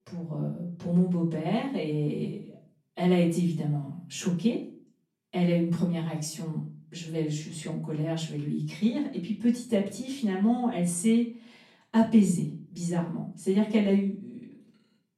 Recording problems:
off-mic speech; far
room echo; slight; dies away in 0.4 s

